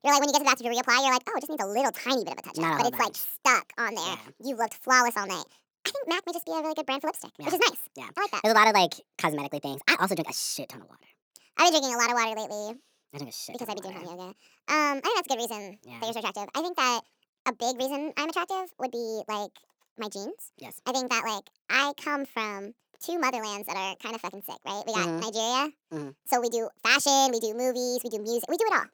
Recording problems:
wrong speed and pitch; too fast and too high; 1.5 times normal speed

